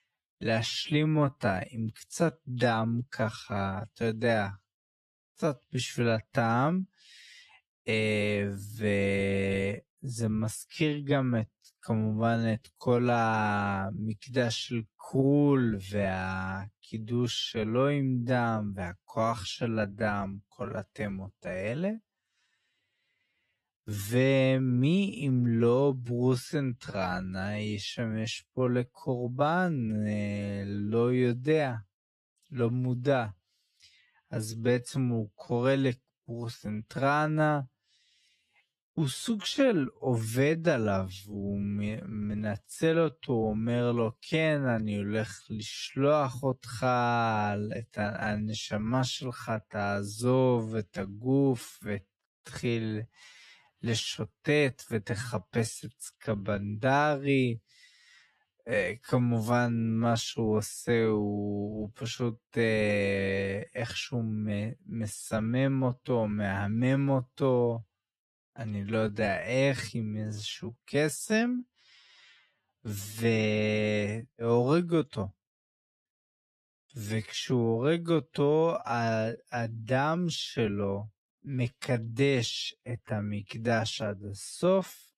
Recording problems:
wrong speed, natural pitch; too slow; 0.5 times normal speed

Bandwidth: 13.5 kHz